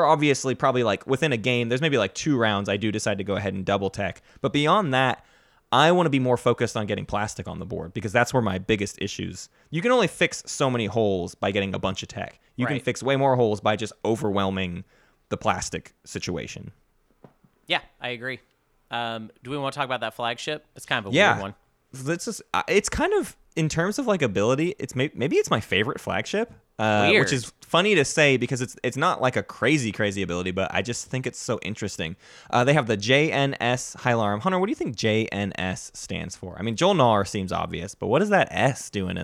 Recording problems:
abrupt cut into speech; at the start and the end

